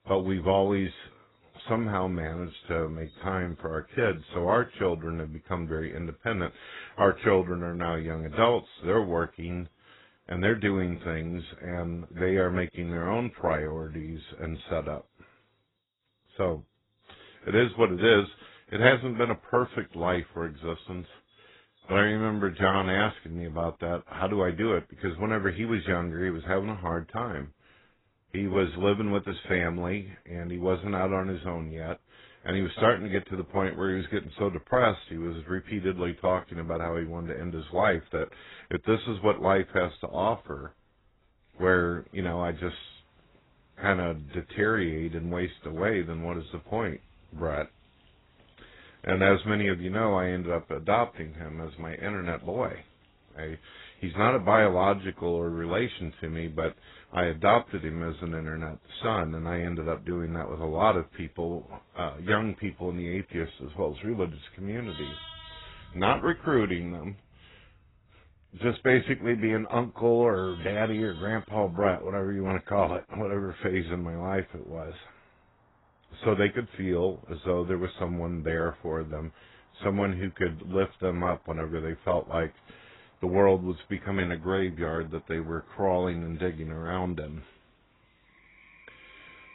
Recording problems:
garbled, watery; badly; nothing above 4 kHz
animal sounds; faint; throughout; 30 dB below the speech

